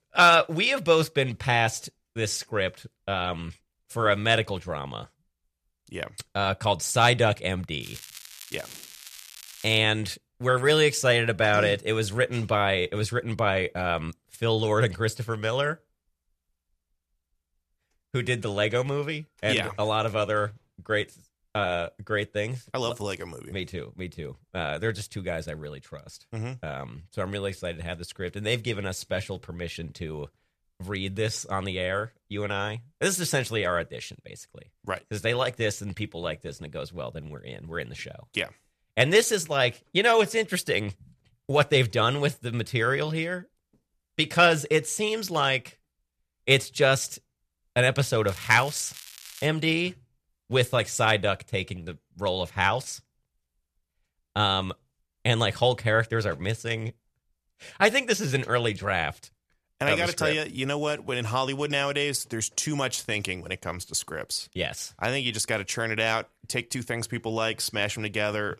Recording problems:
crackling; noticeable; from 8 to 10 s and from 48 to 49 s; 15 dB below the speech

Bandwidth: 14.5 kHz